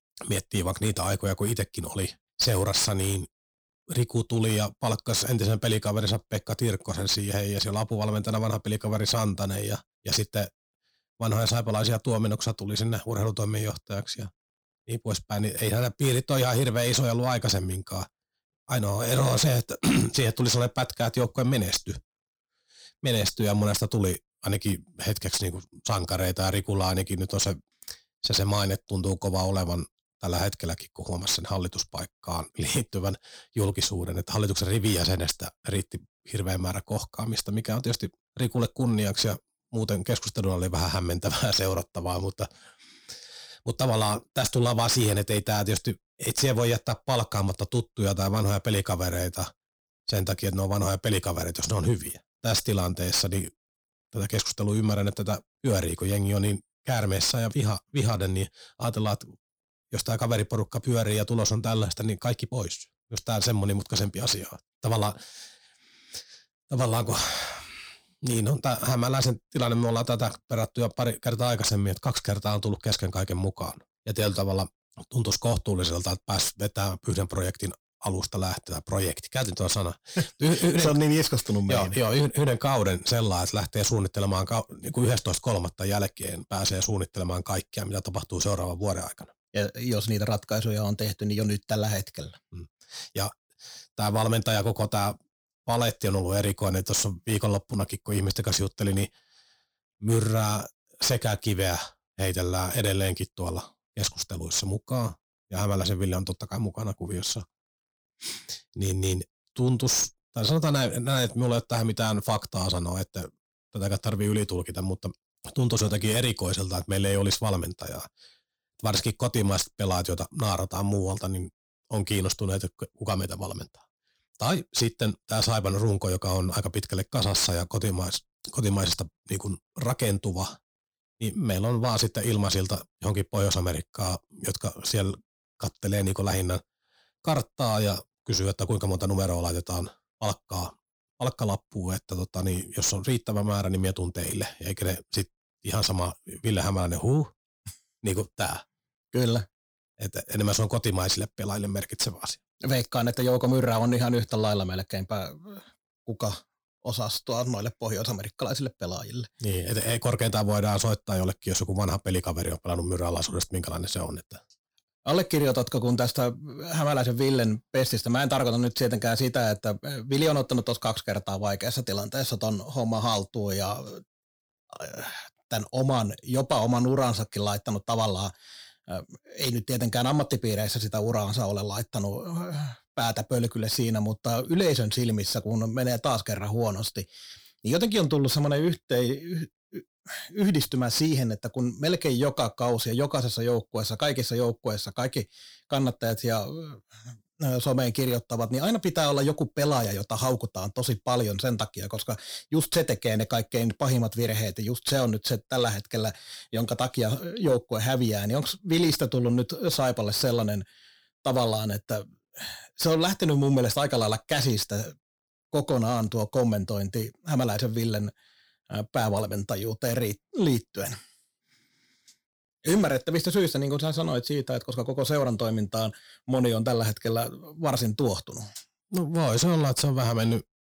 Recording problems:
distortion; slight; 10 dB below the speech

